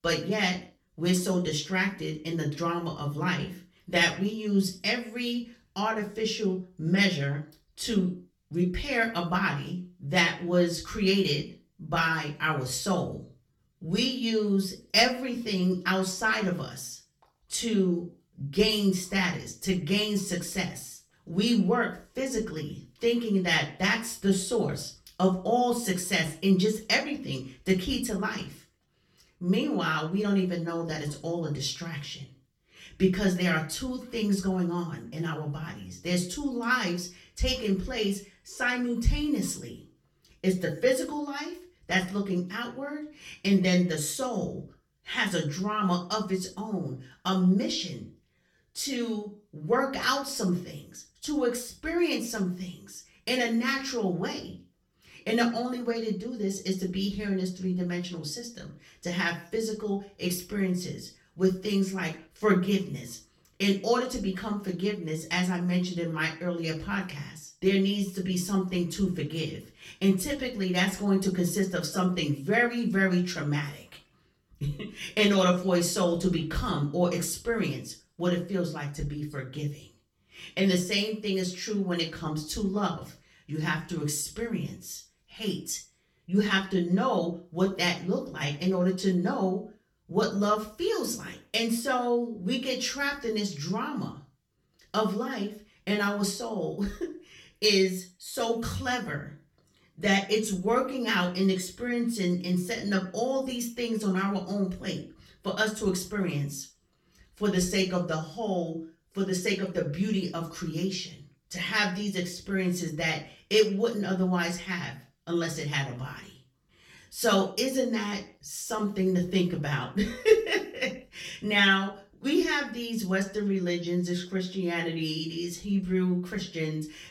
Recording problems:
off-mic speech; far
room echo; slight; dies away in 0.4 s

